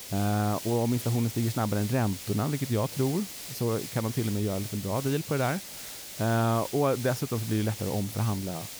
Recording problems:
hiss; loud; throughout; 9 dB below the speech

